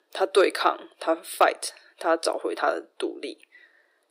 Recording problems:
thin; very; fading below 350 Hz

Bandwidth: 15.5 kHz